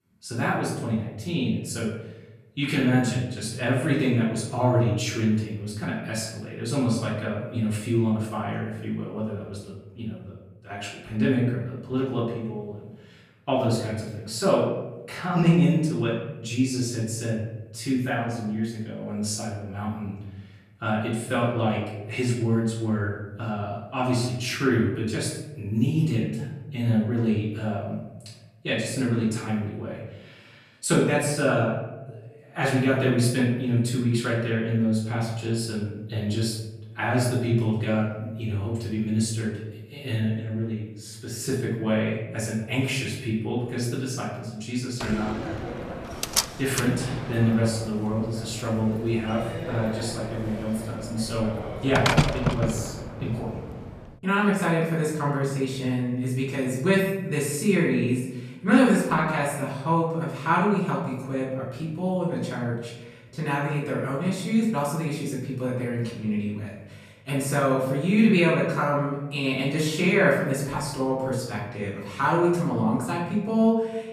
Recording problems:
off-mic speech; far
room echo; noticeable; dies away in 0.9 s
door banging; loud; from 45 to 53 s; peak 5 dB above the speech

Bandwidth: 14 kHz